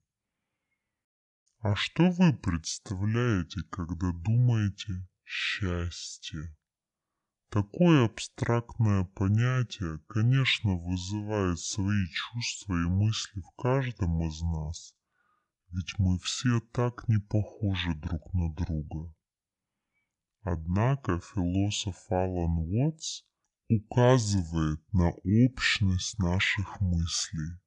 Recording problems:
wrong speed and pitch; too slow and too low; 0.6 times normal speed

